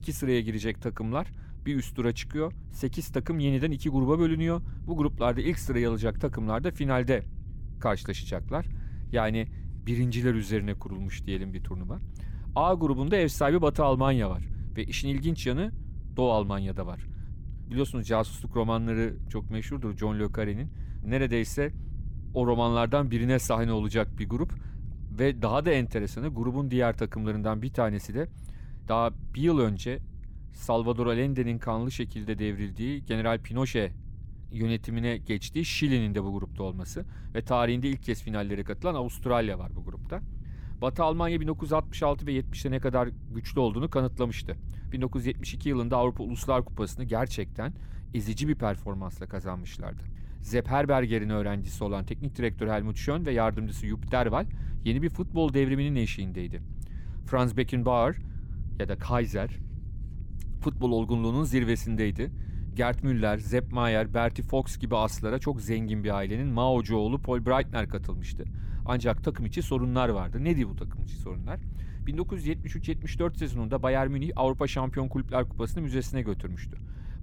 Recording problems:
low rumble; faint; throughout; 25 dB below the speech

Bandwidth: 17 kHz